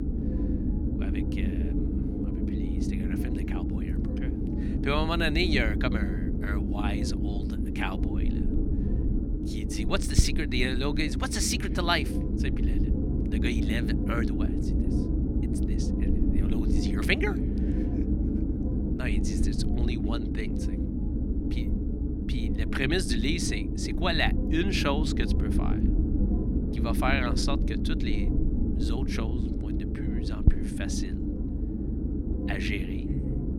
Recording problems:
low rumble; loud; throughout; 5 dB below the speech

